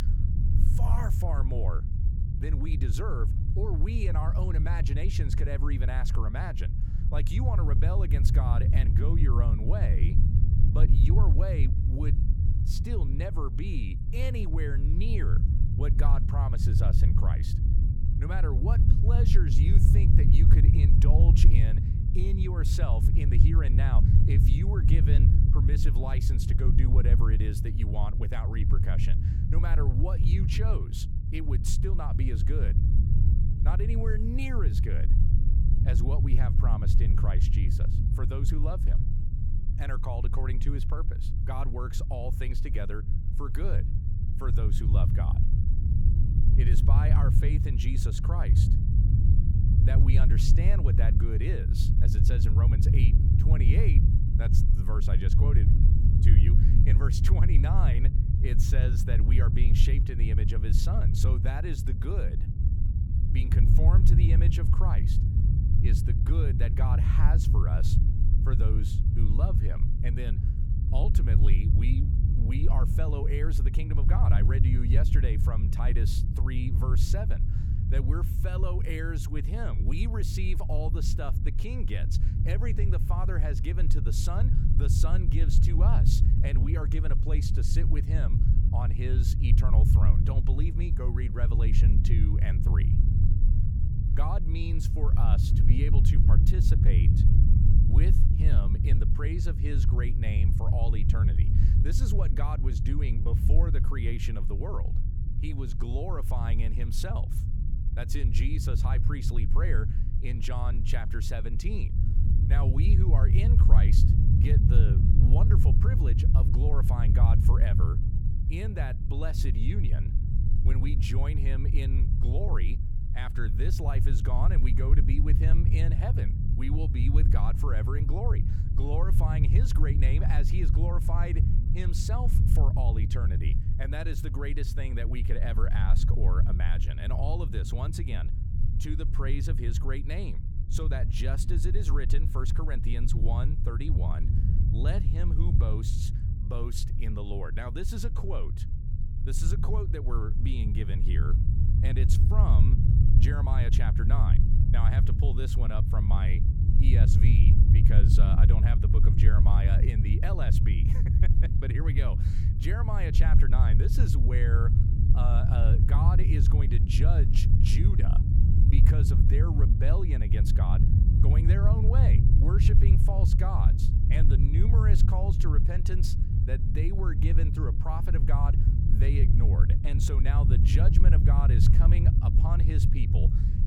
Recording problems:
low rumble; loud; throughout; 1 dB below the speech

